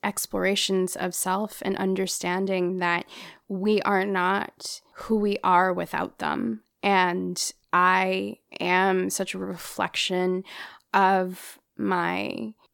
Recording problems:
none

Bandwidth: 17 kHz